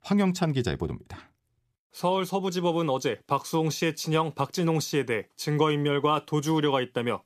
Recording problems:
none

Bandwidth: 14.5 kHz